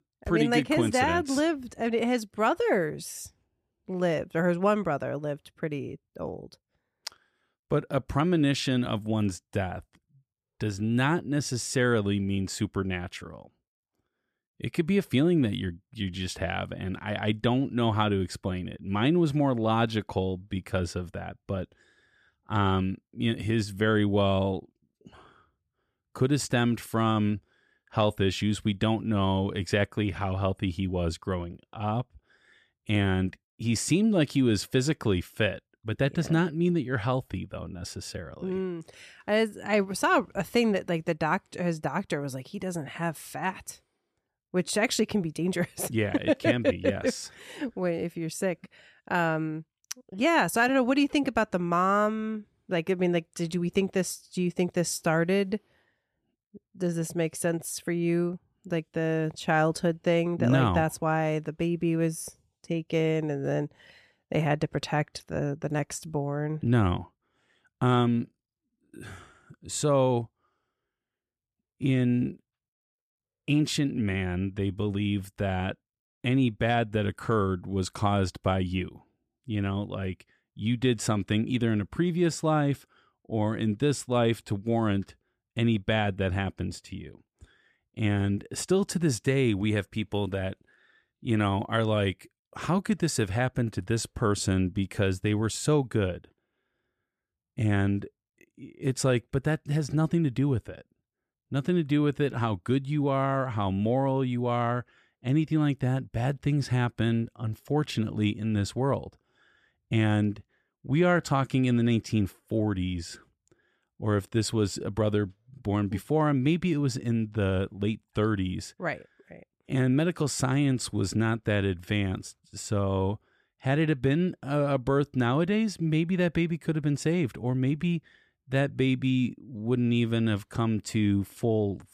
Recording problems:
none

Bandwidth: 14.5 kHz